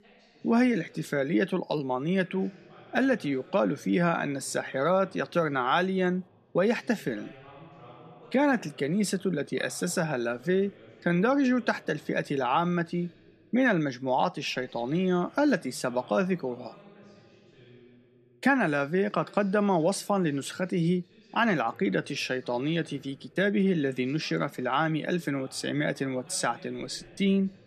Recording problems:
voice in the background; faint; throughout; 25 dB below the speech

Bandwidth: 14 kHz